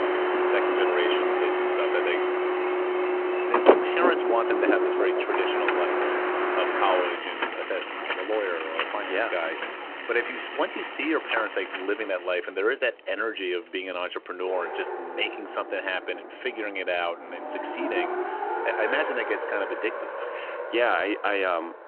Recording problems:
phone-call audio
traffic noise; very loud; throughout; 2 dB above the speech

